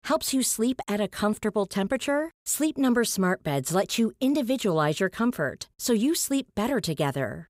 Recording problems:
none

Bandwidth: 15.5 kHz